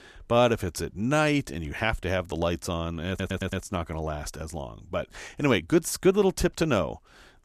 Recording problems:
audio stuttering; at 3 s

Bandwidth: 14.5 kHz